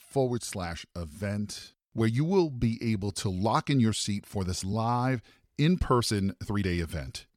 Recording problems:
uneven, jittery; strongly; from 0.5 to 6.5 s

